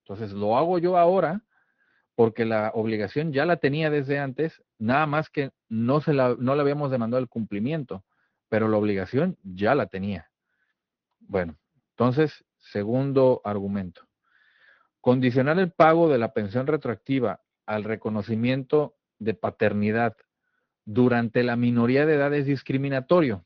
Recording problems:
garbled, watery; slightly
high frequencies cut off; slight; nothing above 6.5 kHz

